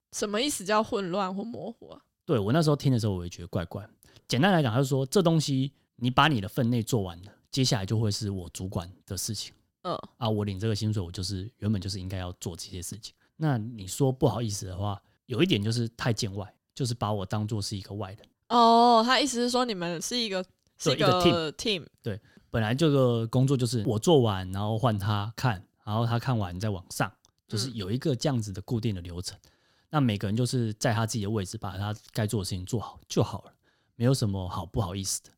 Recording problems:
none

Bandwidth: 16.5 kHz